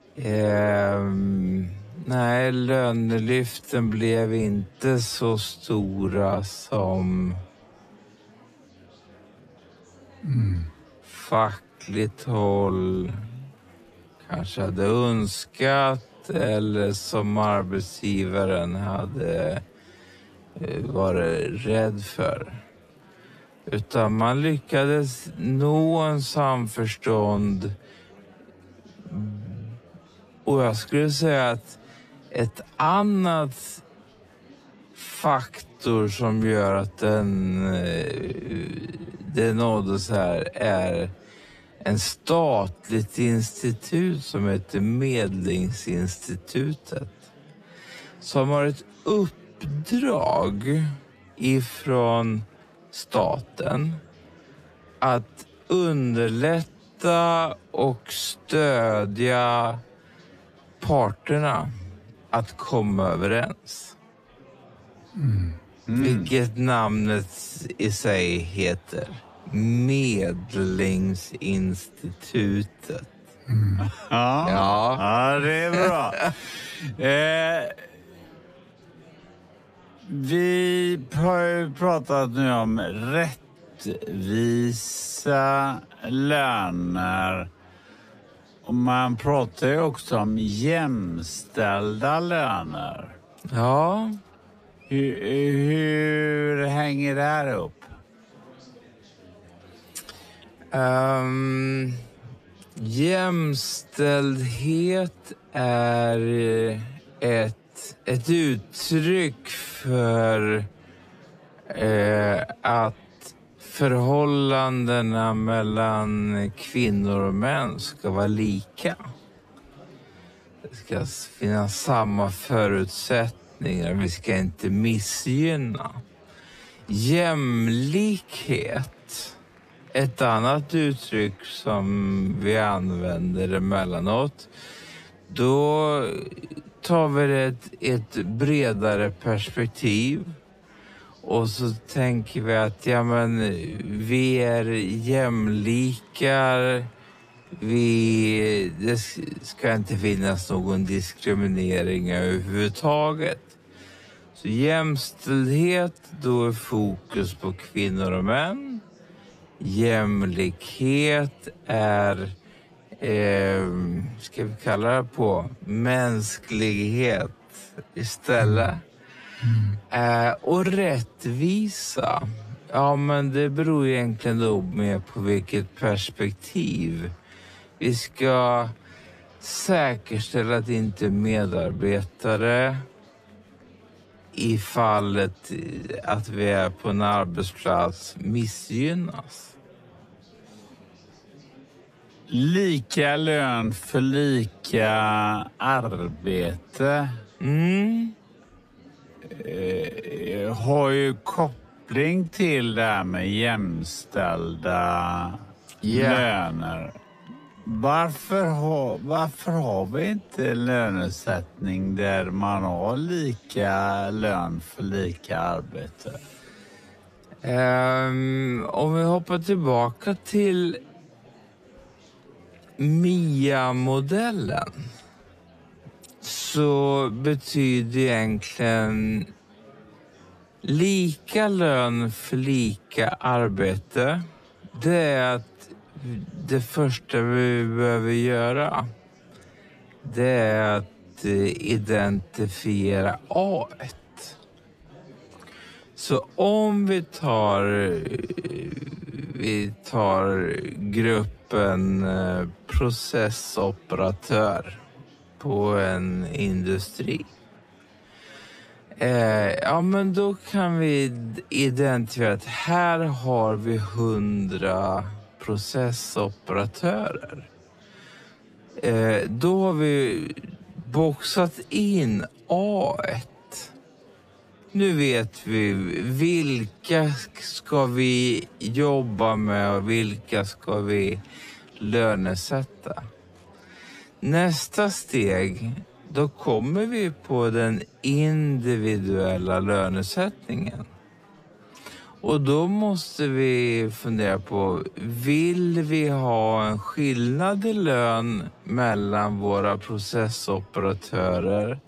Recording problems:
wrong speed, natural pitch; too slow; 0.5 times normal speed
murmuring crowd; faint; throughout; 25 dB below the speech

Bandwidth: 14.5 kHz